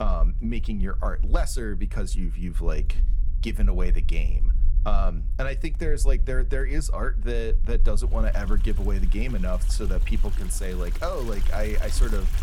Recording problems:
household noises; noticeable; throughout; 15 dB below the speech
low rumble; noticeable; throughout; 20 dB below the speech
abrupt cut into speech; at the start

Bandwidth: 17 kHz